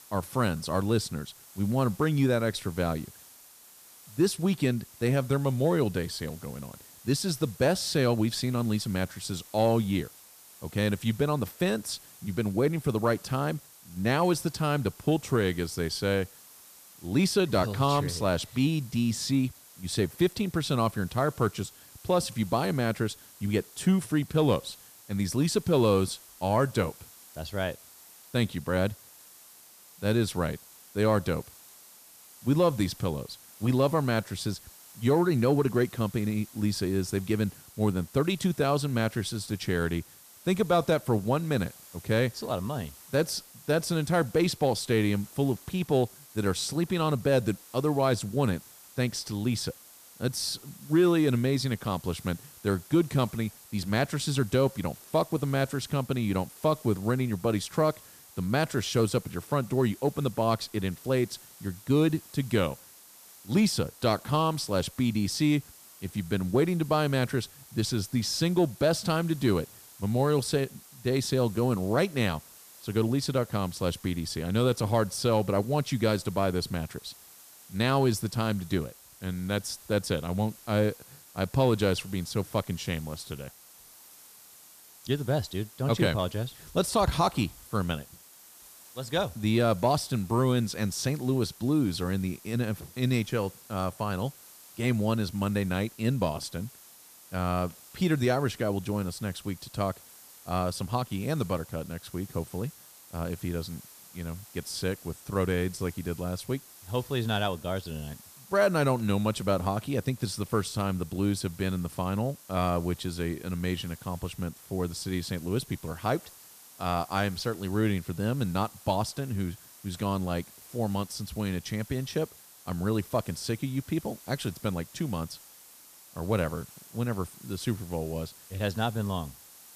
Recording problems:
hiss; faint; throughout; 20 dB below the speech

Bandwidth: 14.5 kHz